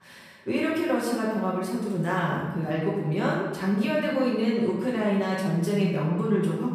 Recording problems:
off-mic speech; far
room echo; noticeable; dies away in 1.2 s
voice in the background; very faint; throughout; 30 dB below the speech

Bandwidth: 15 kHz